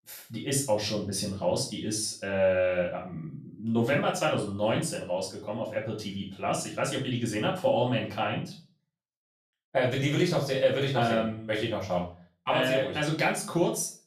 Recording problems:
off-mic speech; far
room echo; slight; dies away in 0.3 s

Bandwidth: 14.5 kHz